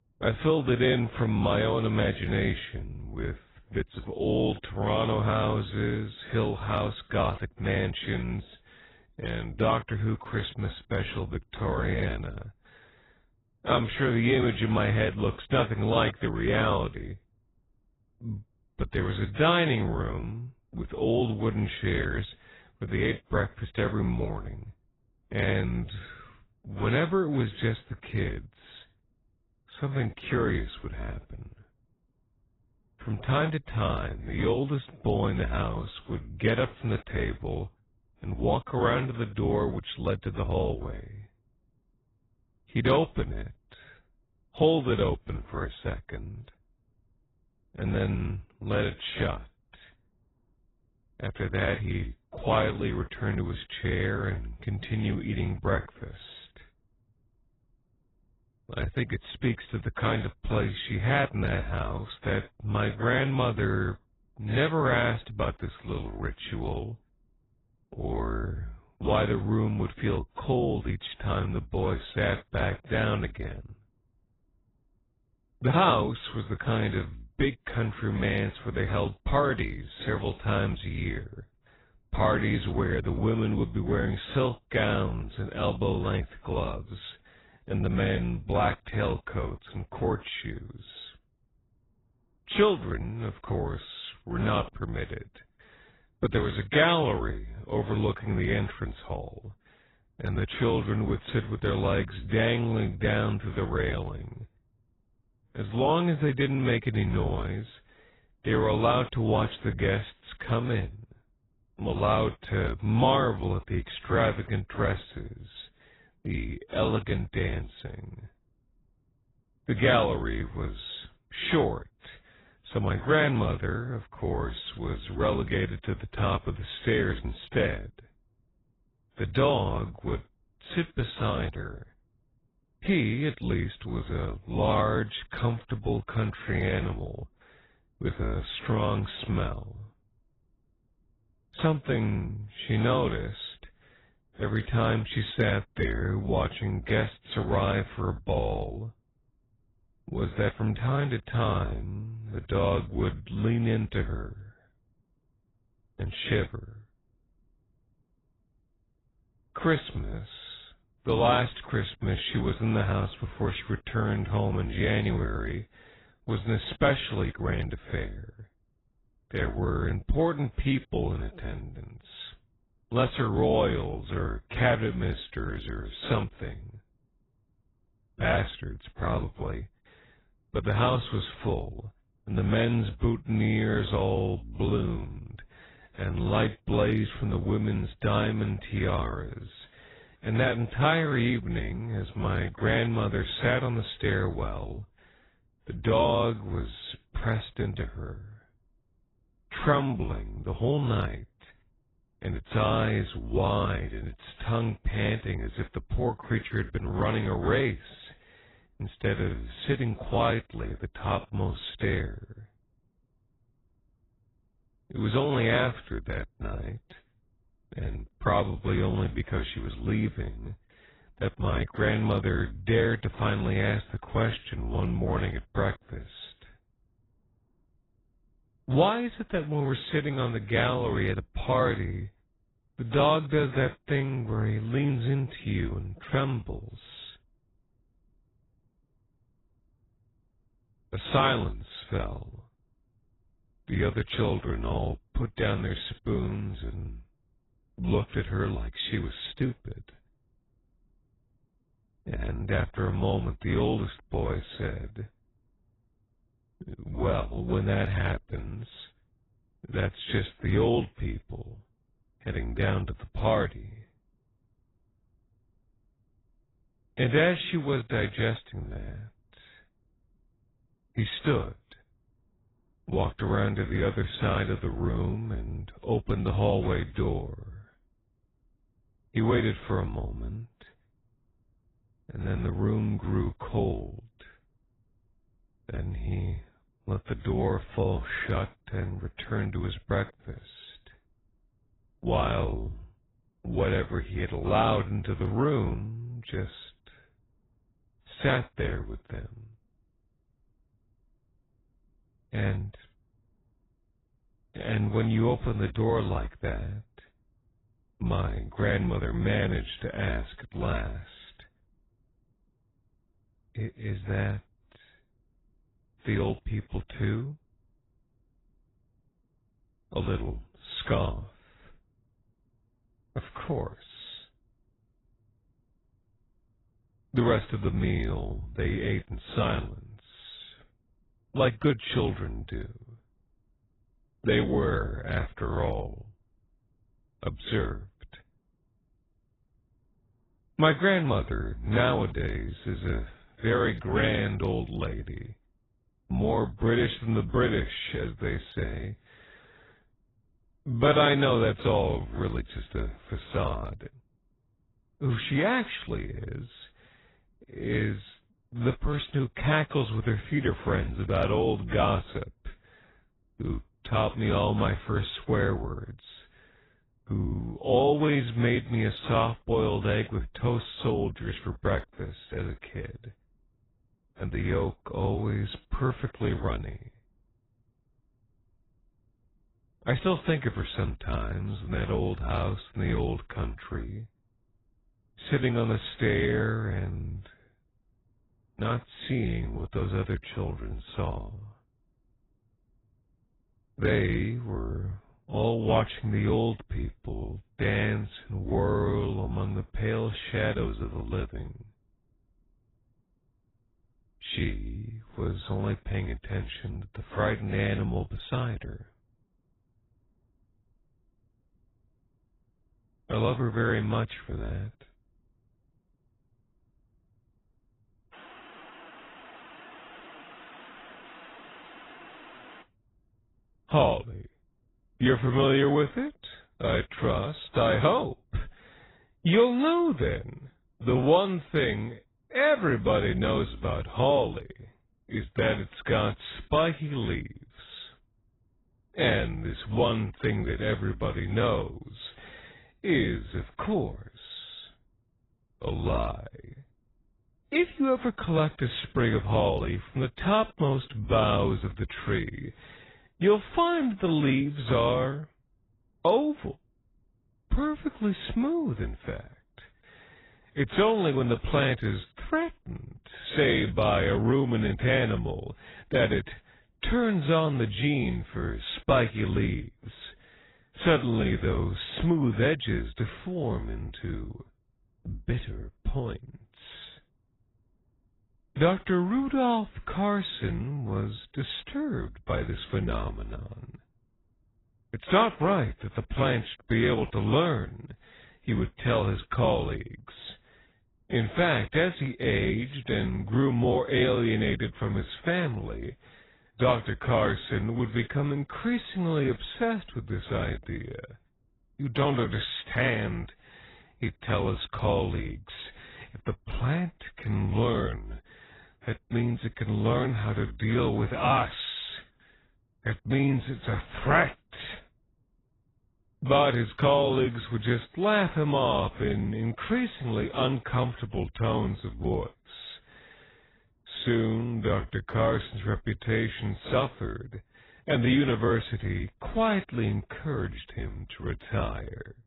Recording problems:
garbled, watery; badly; nothing above 4 kHz
wrong speed, natural pitch; too slow; 0.7 times normal speed

